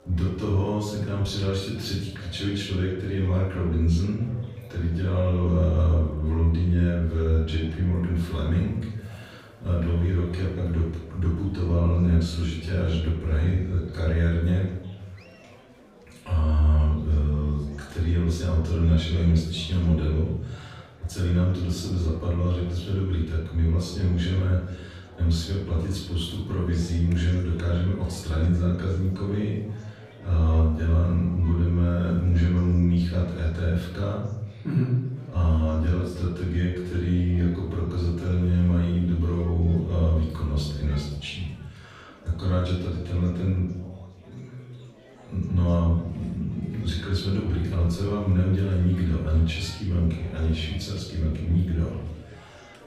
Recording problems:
off-mic speech; far
room echo; noticeable; dies away in 0.8 s
chatter from many people; faint; throughout; 25 dB below the speech

